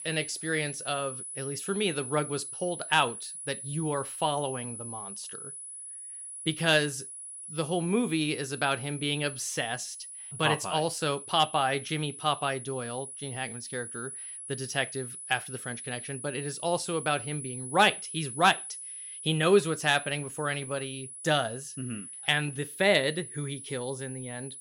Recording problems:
high-pitched whine; loud; throughout; 10 kHz, 9 dB below the speech

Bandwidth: 16 kHz